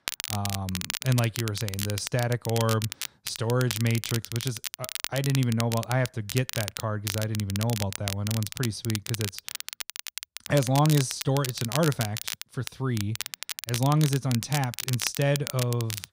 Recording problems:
crackle, like an old record; loud; 6 dB below the speech

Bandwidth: 15.5 kHz